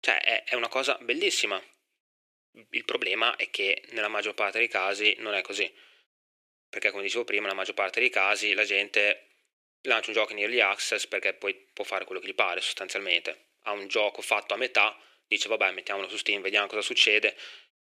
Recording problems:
thin; very; fading below 400 Hz

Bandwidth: 14.5 kHz